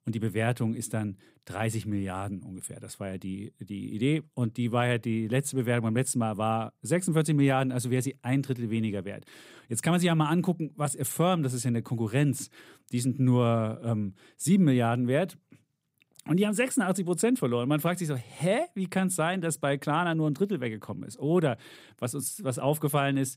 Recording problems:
none

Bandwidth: 15.5 kHz